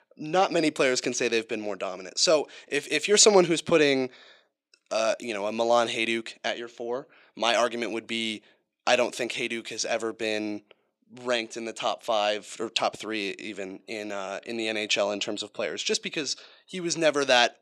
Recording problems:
thin; somewhat; fading below 350 Hz

